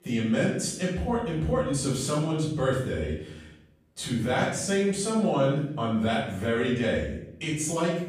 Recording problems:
off-mic speech; far
room echo; noticeable; dies away in 0.7 s

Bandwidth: 15 kHz